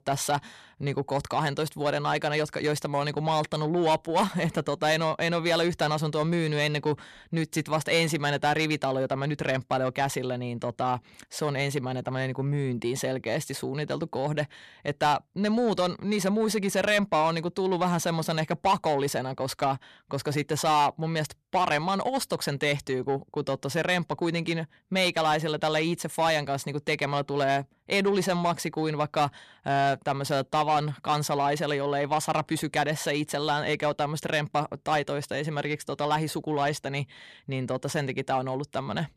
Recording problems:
distortion; slight; 10 dB below the speech

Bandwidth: 14 kHz